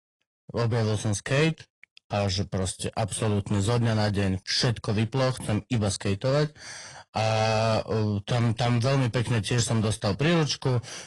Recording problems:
distortion; slight; 9% of the sound clipped
garbled, watery; slightly; nothing above 10 kHz

